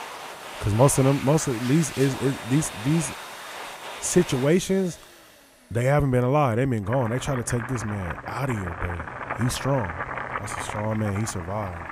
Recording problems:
household noises; loud; throughout; 10 dB below the speech

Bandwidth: 15.5 kHz